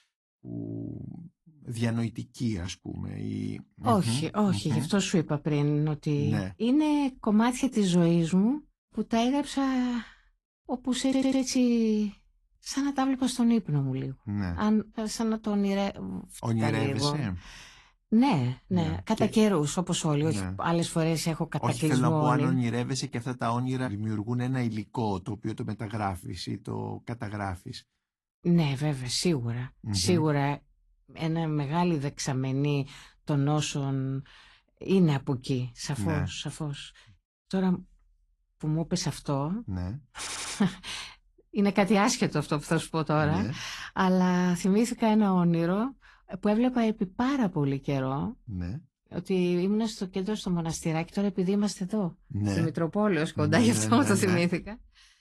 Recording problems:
garbled, watery; slightly; nothing above 11.5 kHz
audio stuttering; at 11 s and at 40 s

